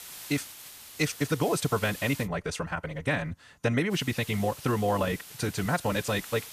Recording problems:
wrong speed, natural pitch; too fast; 1.8 times normal speed
hiss; noticeable; until 2.5 s and from 4 s on; 15 dB below the speech

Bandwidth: 14.5 kHz